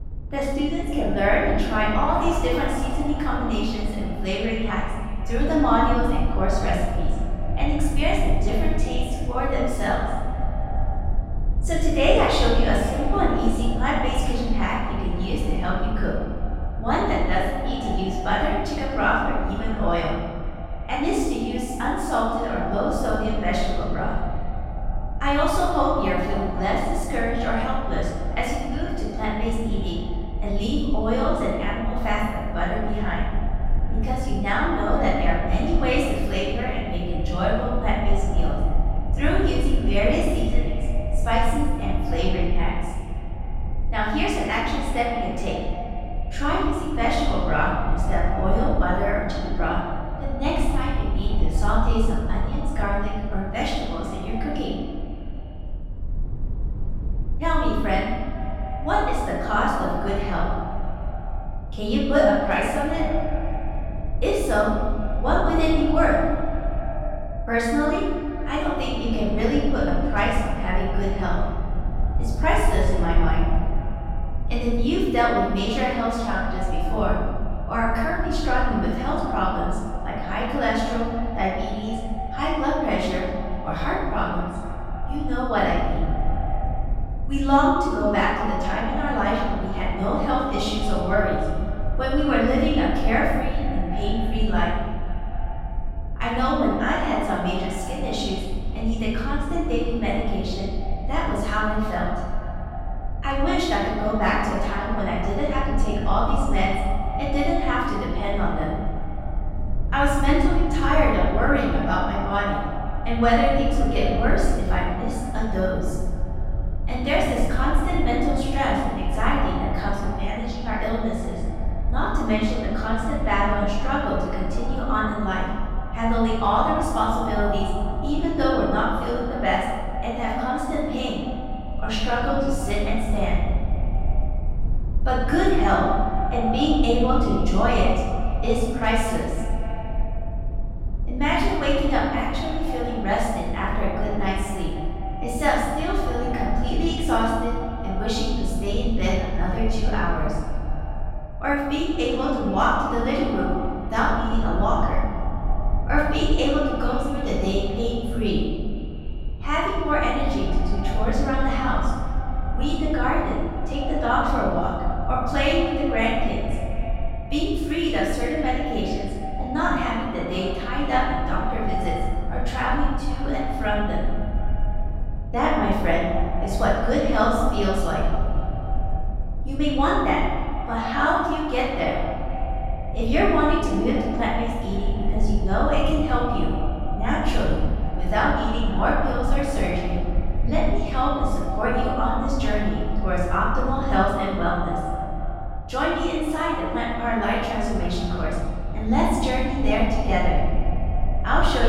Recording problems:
echo of what is said; strong; throughout; 250 ms later, 10 dB below the speech
room echo; strong; dies away in 1.5 s
off-mic speech; far
low rumble; faint; throughout; 20 dB below the speech
abrupt cut into speech; at the end

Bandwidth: 16 kHz